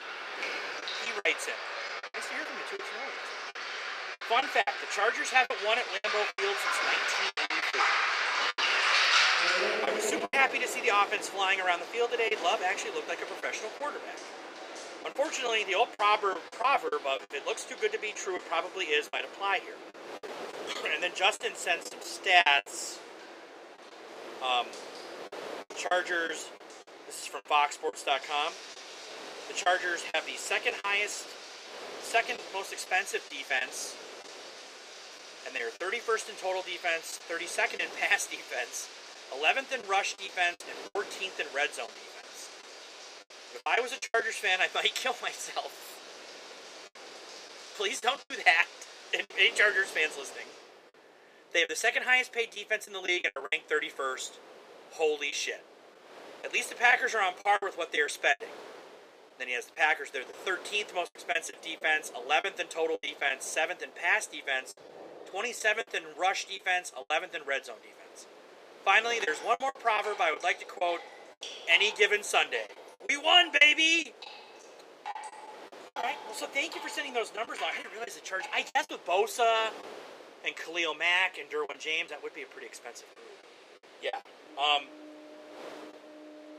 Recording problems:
thin; very; fading below 450 Hz
rain or running water; loud; throughout; 7 dB below the speech
wind noise on the microphone; occasional gusts; 20 dB below the speech
choppy; very; 7% of the speech affected

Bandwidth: 15 kHz